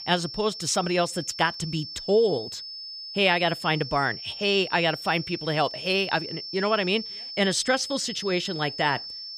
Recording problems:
high-pitched whine; loud; throughout; 5.5 kHz, 9 dB below the speech

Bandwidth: 15 kHz